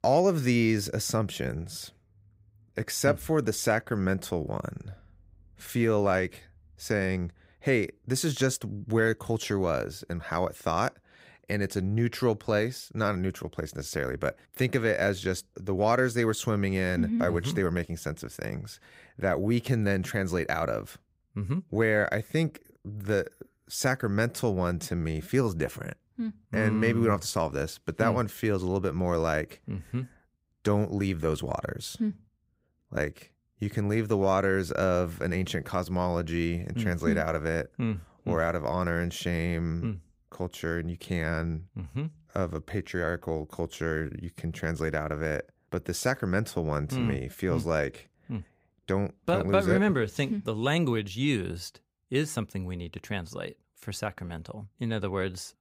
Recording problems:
none

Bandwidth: 15.5 kHz